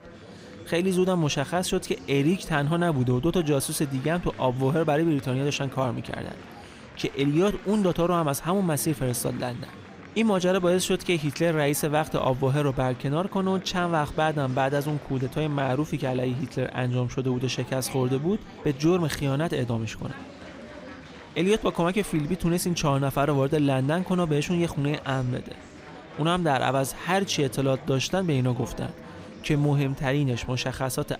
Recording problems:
murmuring crowd; noticeable; throughout; 20 dB below the speech

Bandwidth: 15.5 kHz